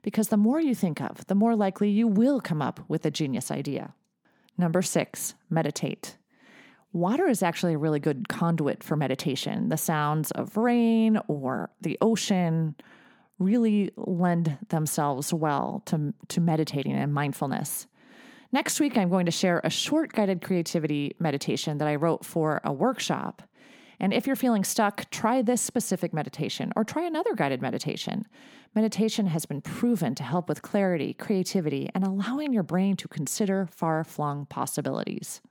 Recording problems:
none

